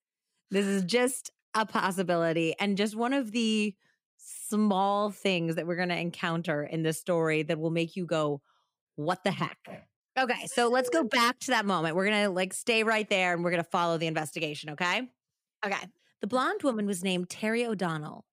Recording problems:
none

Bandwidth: 15.5 kHz